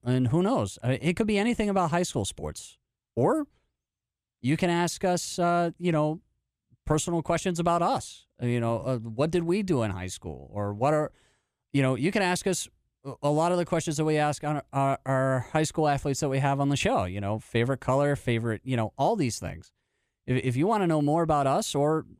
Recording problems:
none

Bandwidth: 14.5 kHz